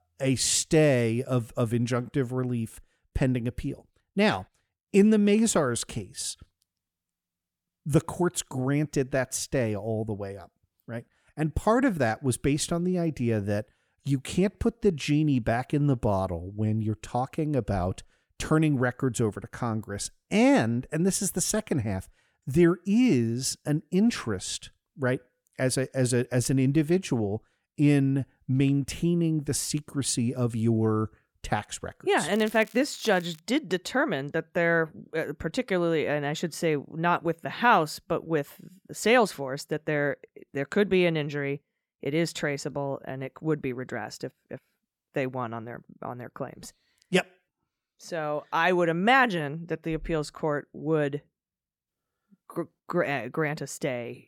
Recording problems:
crackling; faint; from 32 to 33 s; 20 dB below the speech

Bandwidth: 17 kHz